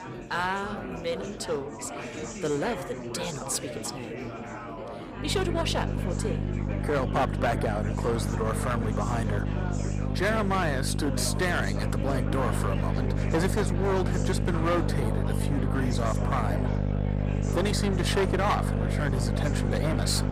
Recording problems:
distortion; slight; 9% of the sound clipped
electrical hum; loud; from 5 s on; 50 Hz, 7 dB below the speech
chatter from many people; loud; throughout; 8 dB below the speech
household noises; faint; throughout; 25 dB below the speech
background music; faint; throughout; 25 dB below the speech

